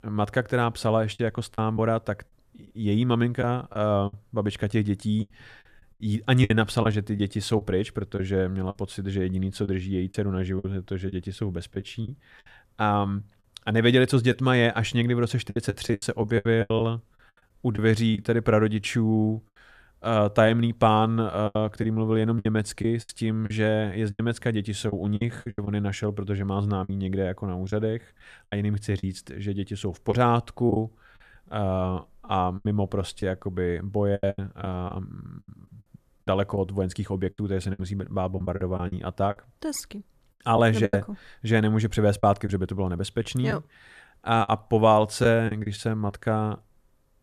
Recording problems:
choppy; very; 8% of the speech affected

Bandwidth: 14.5 kHz